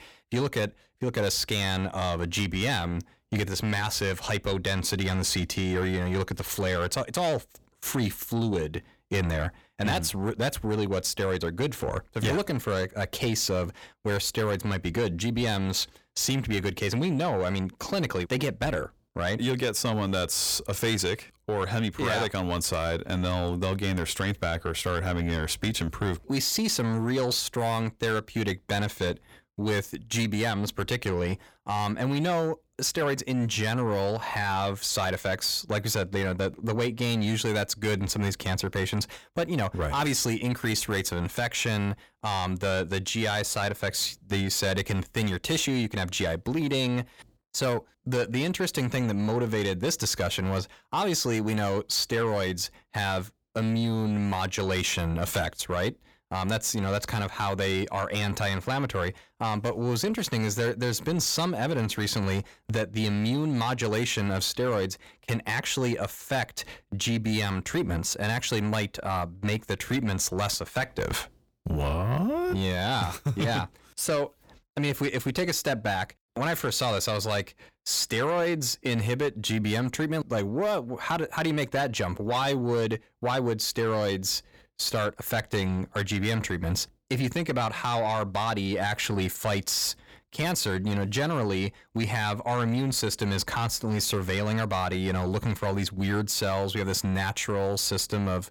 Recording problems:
distortion; slight; 10 dB below the speech

